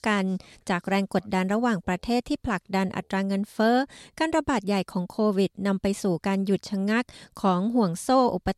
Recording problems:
none

